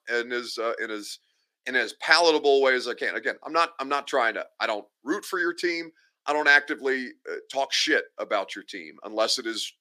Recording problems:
thin; somewhat; fading below 300 Hz

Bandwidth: 15 kHz